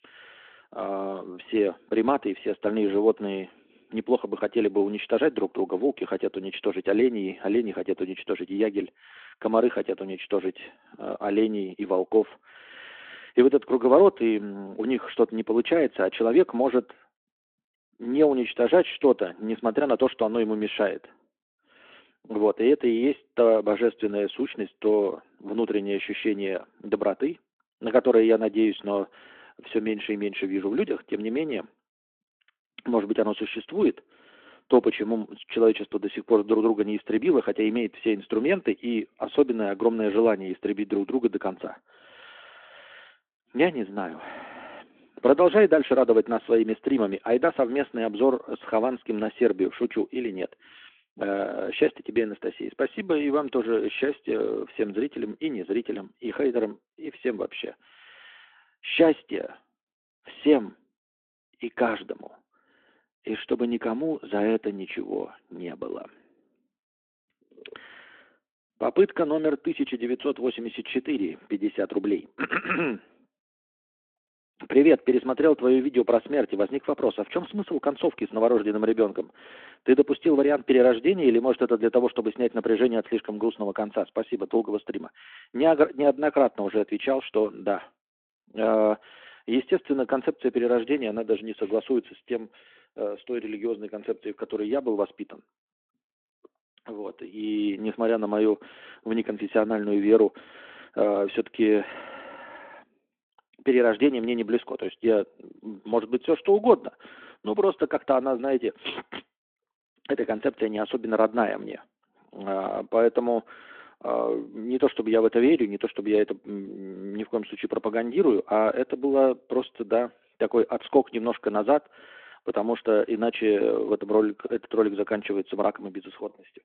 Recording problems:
phone-call audio

